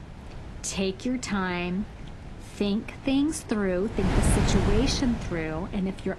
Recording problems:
garbled, watery; slightly; nothing above 11 kHz
wind noise on the microphone; heavy; 5 dB below the speech

